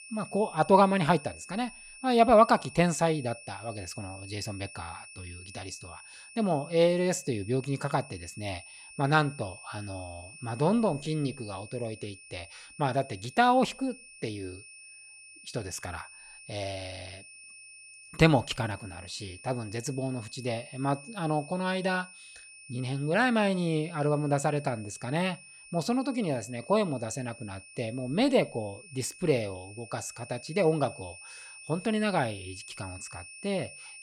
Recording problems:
high-pitched whine; noticeable; throughout; 2.5 kHz, 20 dB below the speech

